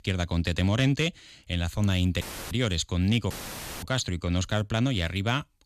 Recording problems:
audio cutting out; filled with static; at 2 s and at 3.5 s for 0.5 s

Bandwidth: 14.5 kHz